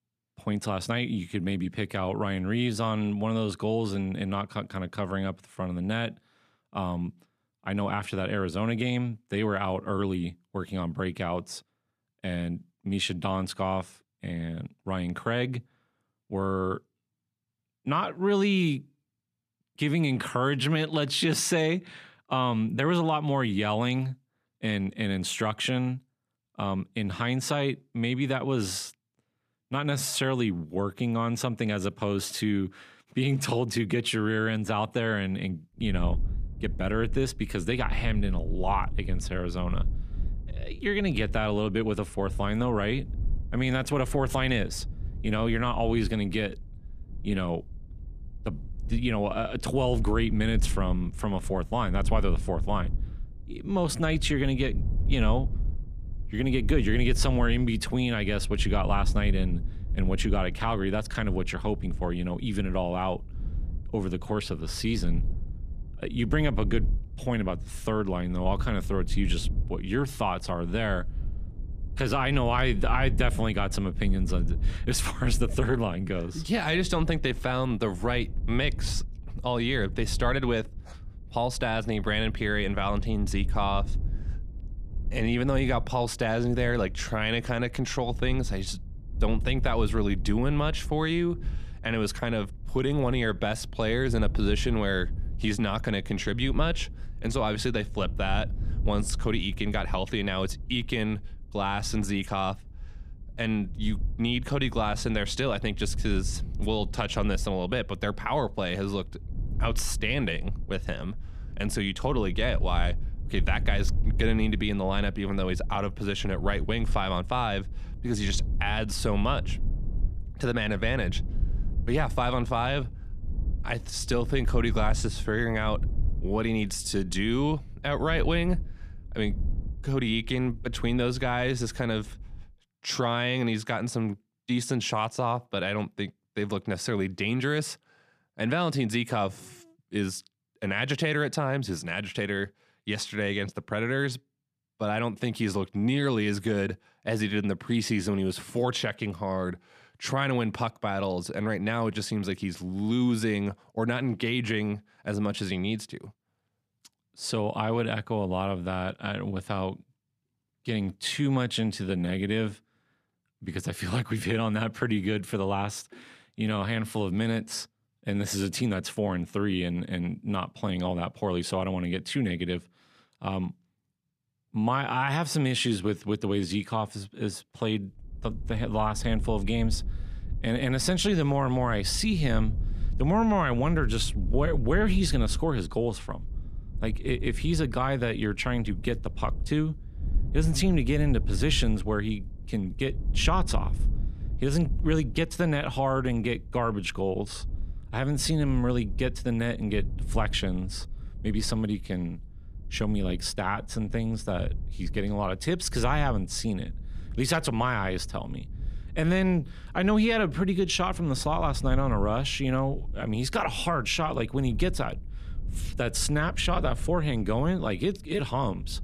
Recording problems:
wind noise on the microphone; occasional gusts; from 36 s to 2:12 and from 2:58 on; 20 dB below the speech

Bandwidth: 14.5 kHz